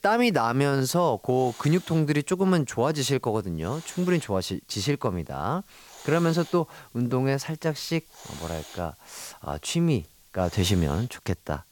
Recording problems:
hiss; faint; throughout; 20 dB below the speech

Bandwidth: 17.5 kHz